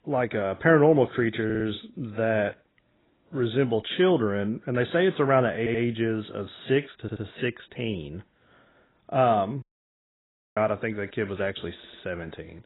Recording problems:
garbled, watery; badly; nothing above 4 kHz
audio stuttering; 4 times, first at 1.5 s
audio cutting out; at 9.5 s for 1 s

